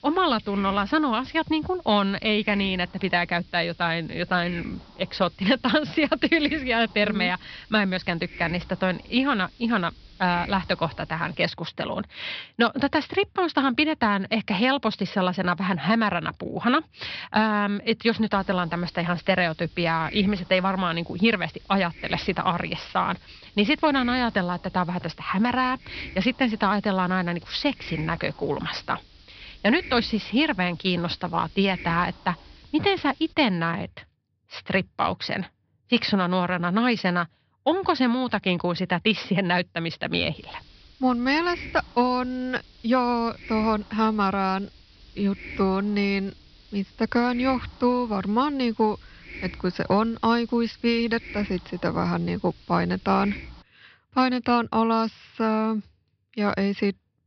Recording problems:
high frequencies cut off; noticeable; nothing above 5.5 kHz
hiss; noticeable; until 11 s, from 18 to 33 s and from 40 to 54 s; 20 dB below the speech

